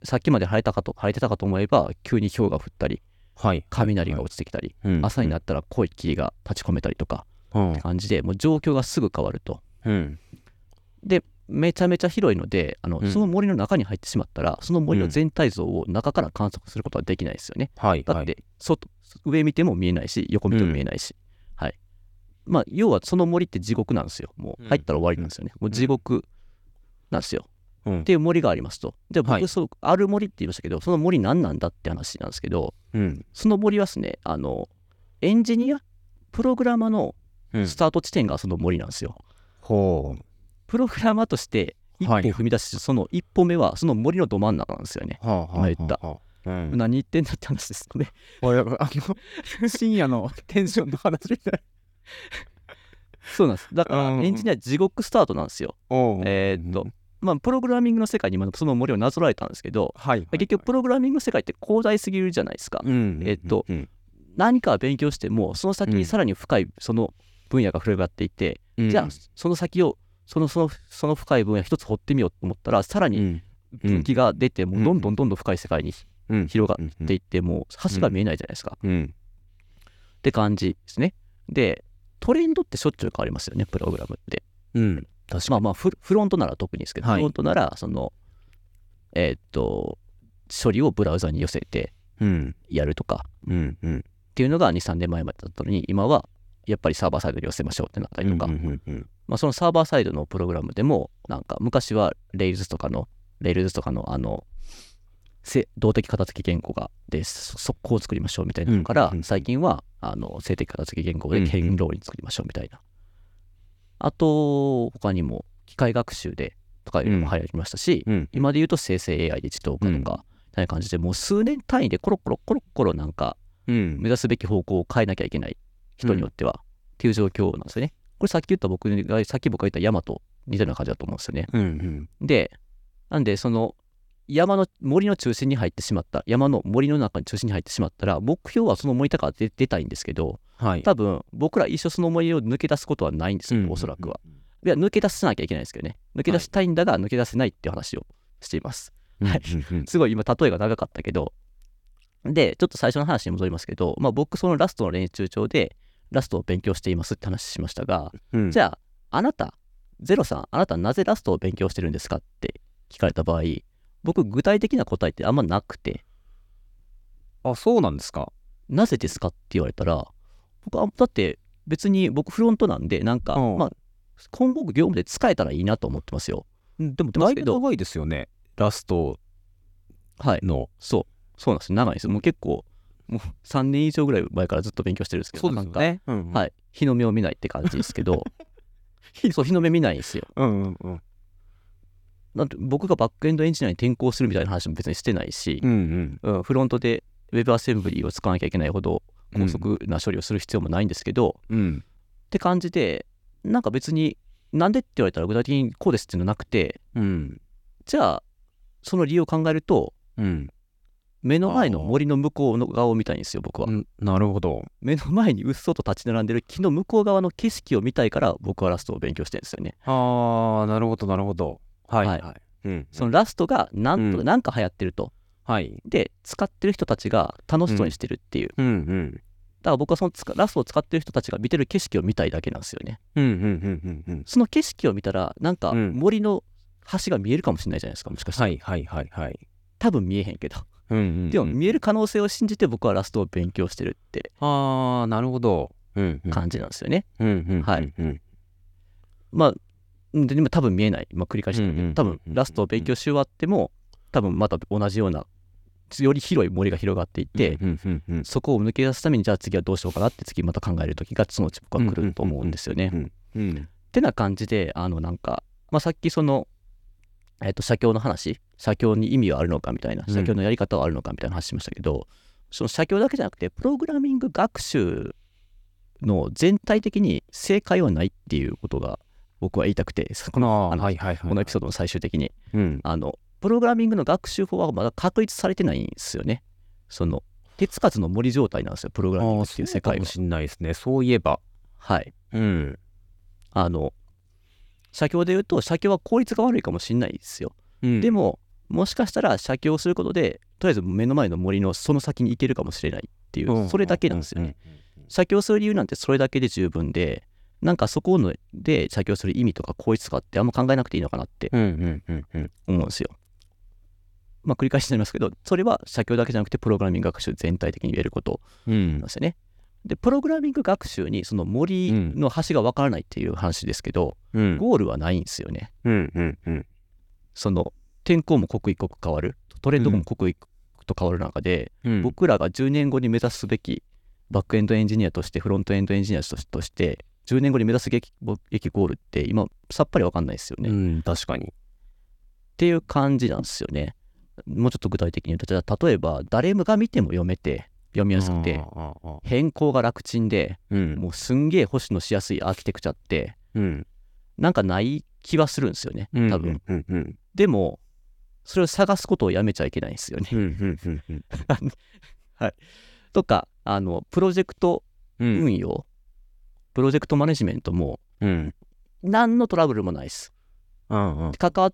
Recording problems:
none

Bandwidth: 17.5 kHz